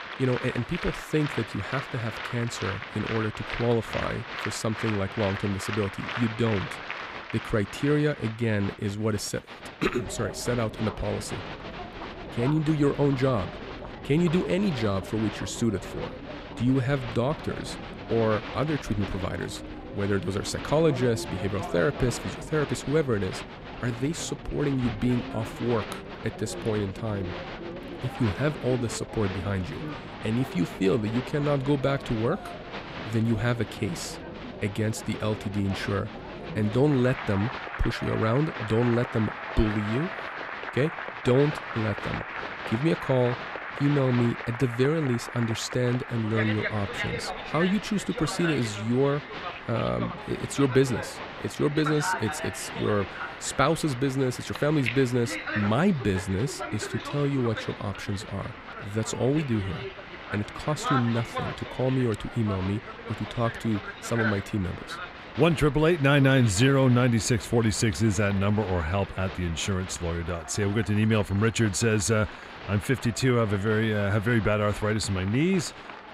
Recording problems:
crowd noise; loud; throughout; 9 dB below the speech

